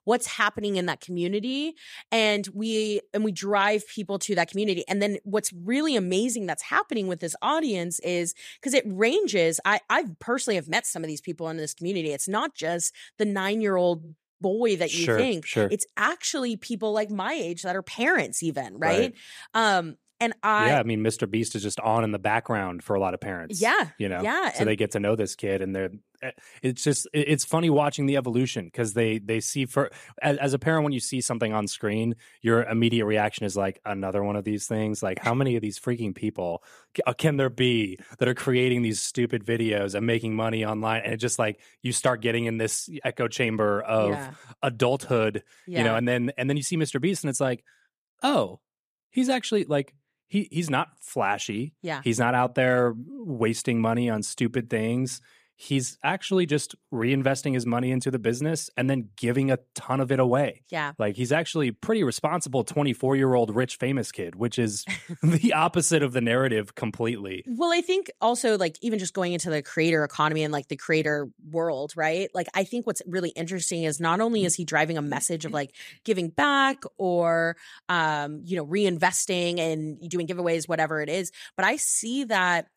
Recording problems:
uneven, jittery; strongly; from 27 s to 1:20

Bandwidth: 14.5 kHz